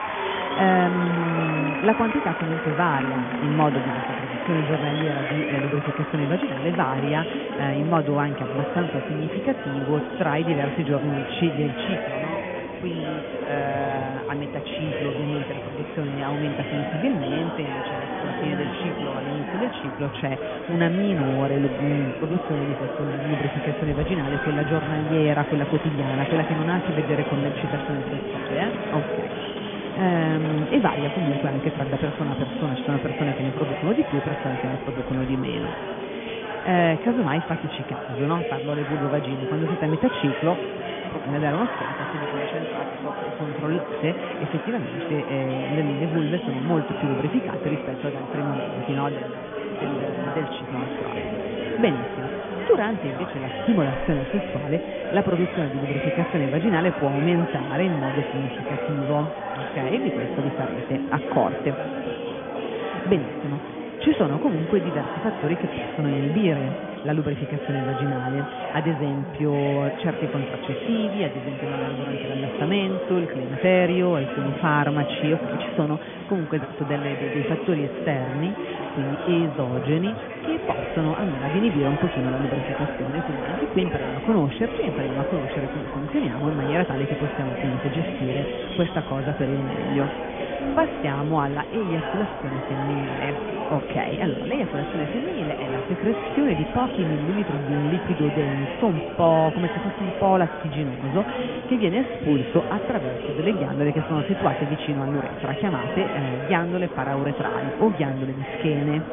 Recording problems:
high frequencies cut off; severe; nothing above 3.5 kHz
chatter from many people; loud; throughout; 4 dB below the speech

